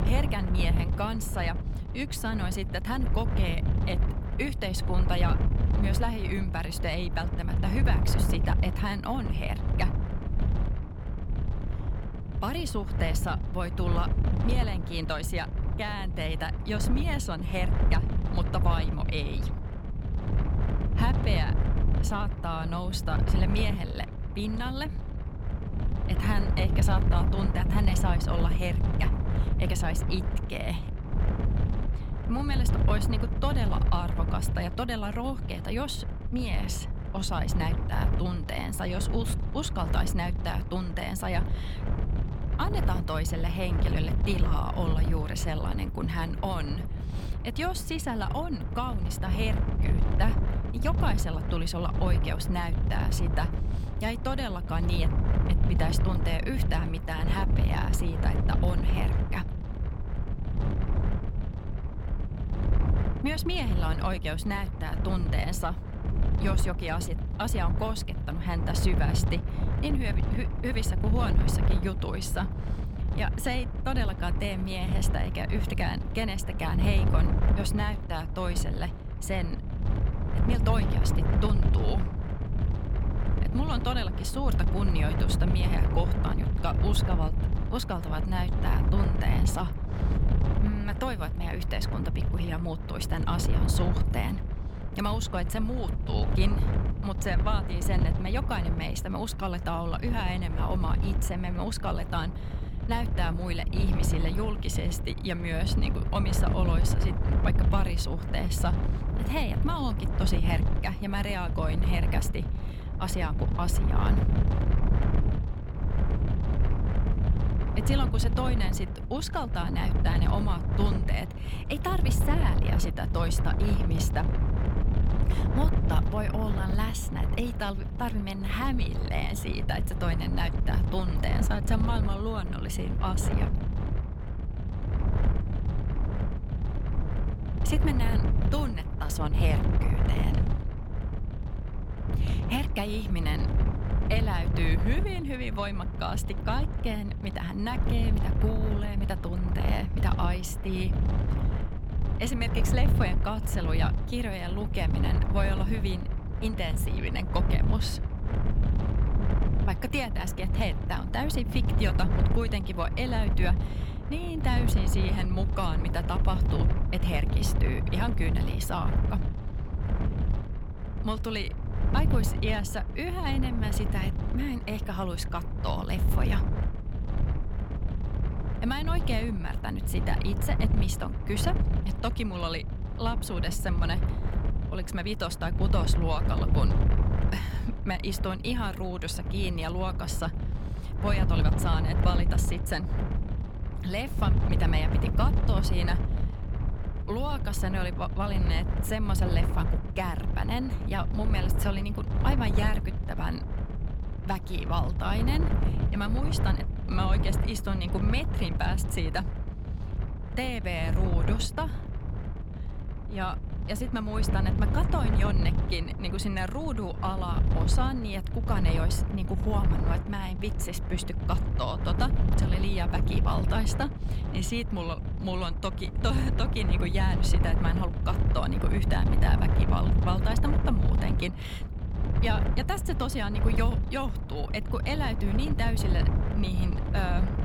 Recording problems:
wind noise on the microphone; heavy; 6 dB below the speech

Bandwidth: 17 kHz